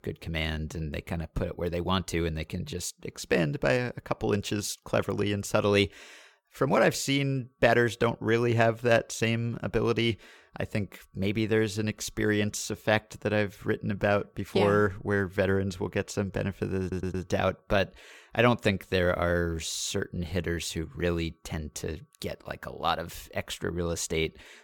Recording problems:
audio stuttering; at 17 s

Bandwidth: 17.5 kHz